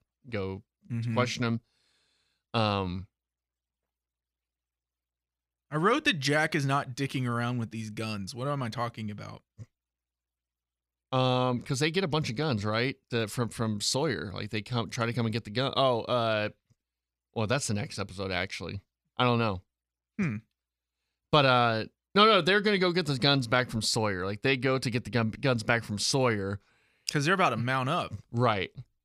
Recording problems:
none

